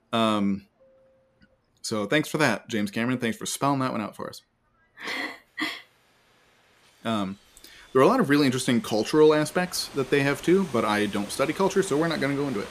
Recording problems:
train or aircraft noise; noticeable; throughout; 20 dB below the speech

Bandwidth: 14.5 kHz